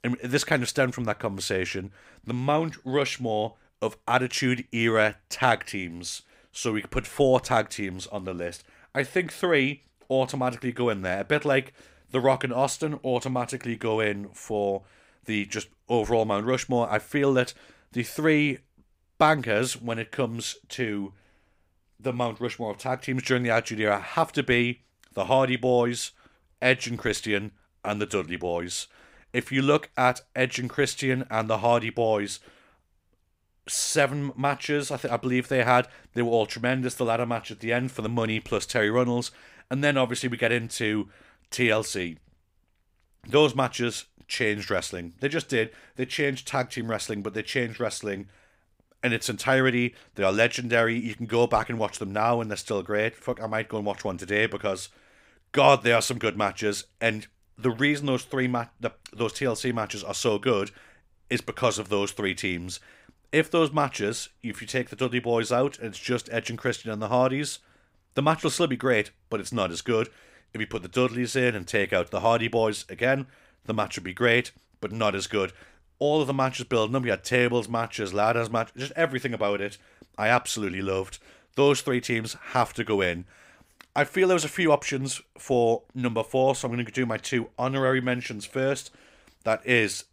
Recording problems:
none

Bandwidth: 15.5 kHz